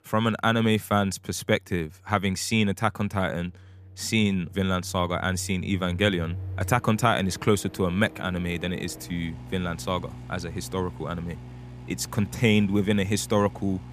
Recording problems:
household noises; noticeable; throughout; 15 dB below the speech

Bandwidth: 14.5 kHz